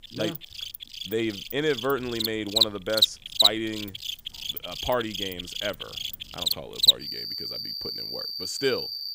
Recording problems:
animal sounds; very loud; throughout; 5 dB above the speech

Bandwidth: 15.5 kHz